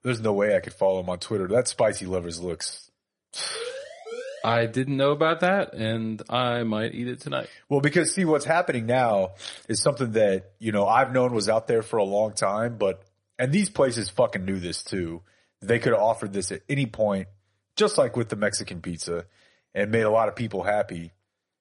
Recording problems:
garbled, watery; slightly; nothing above 10.5 kHz
siren; faint; from 3.5 to 4.5 s; peak 10 dB below the speech

